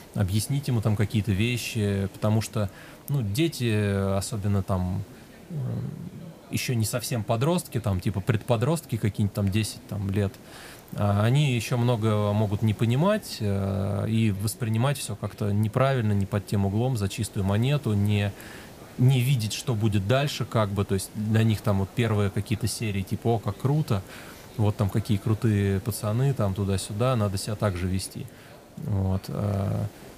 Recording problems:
voice in the background; faint; throughout; 25 dB below the speech
hiss; faint; throughout; 20 dB below the speech

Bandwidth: 15 kHz